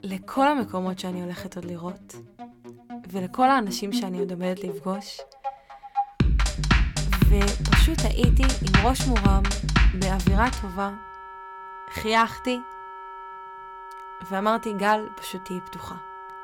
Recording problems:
background music; very loud; throughout; 3 dB above the speech

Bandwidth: 17 kHz